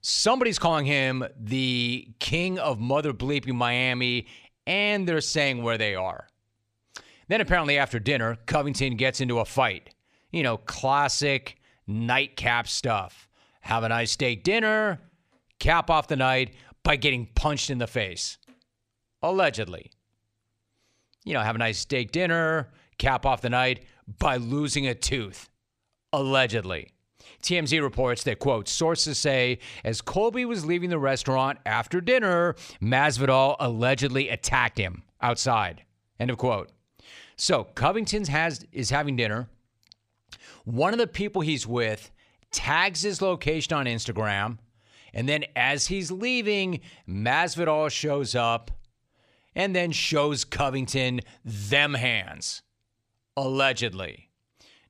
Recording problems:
none

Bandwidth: 14.5 kHz